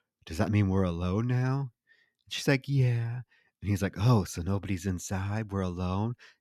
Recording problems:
none

